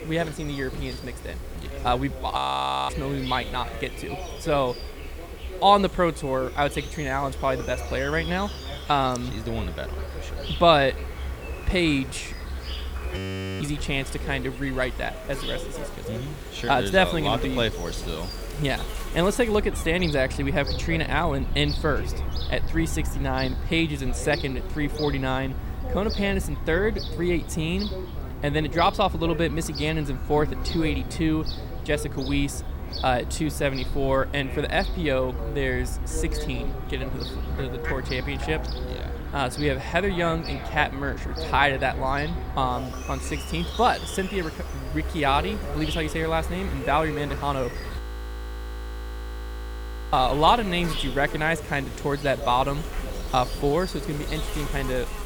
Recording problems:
animal sounds; loud; throughout; 8 dB below the speech
voice in the background; noticeable; throughout; 15 dB below the speech
audio freezing; at 2.5 s for 0.5 s, at 13 s and at 48 s for 2 s

